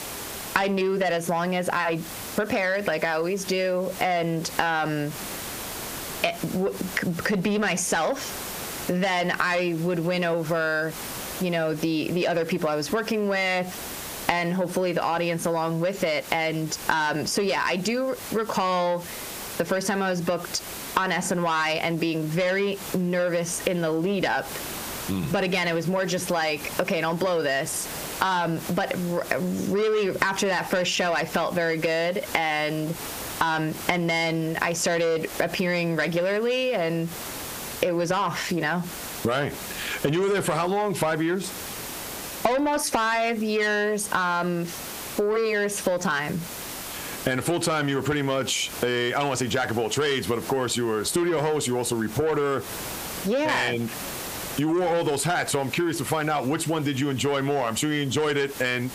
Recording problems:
squashed, flat; heavily
distortion; slight; 10 dB below the speech
hiss; noticeable; throughout; 15 dB below the speech

